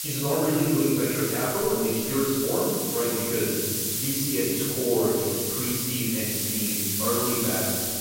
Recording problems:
room echo; strong; dies away in 1.9 s
off-mic speech; far
hiss; loud; throughout; as loud as the speech

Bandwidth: 16 kHz